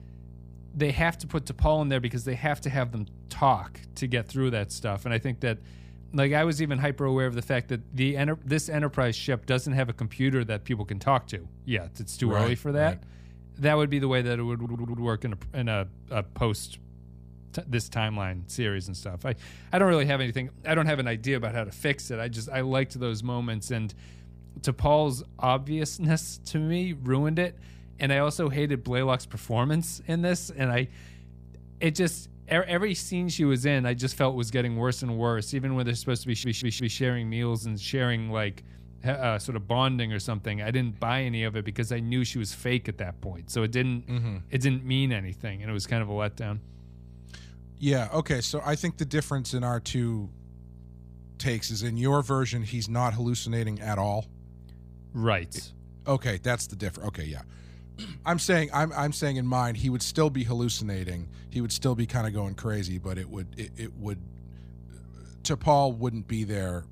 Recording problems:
electrical hum; faint; throughout; 60 Hz, 30 dB below the speech
audio stuttering; at 15 s and at 36 s

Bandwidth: 15 kHz